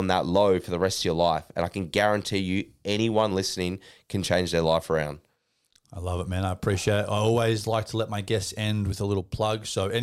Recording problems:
abrupt cut into speech; at the start and the end

